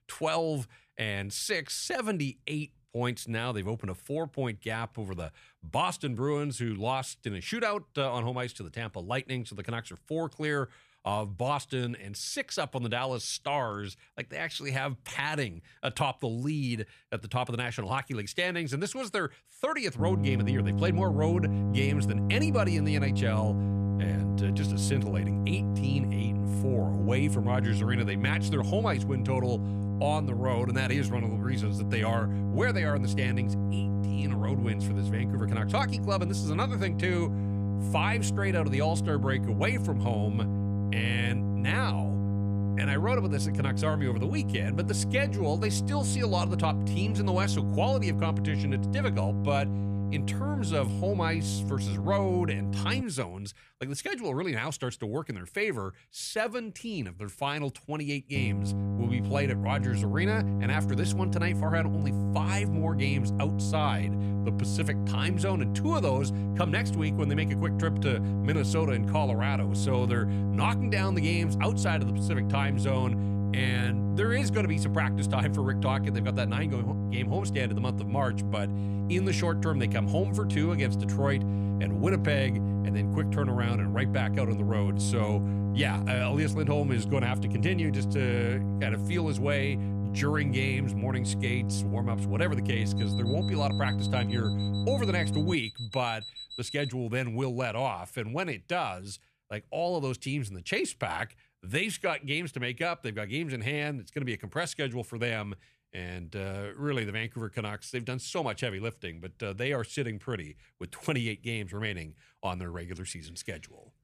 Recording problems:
electrical hum; loud; from 20 to 53 s and from 58 s to 1:36; 50 Hz, 6 dB below the speech
alarm; noticeable; from 1:33 to 1:37; peak 8 dB below the speech

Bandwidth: 14.5 kHz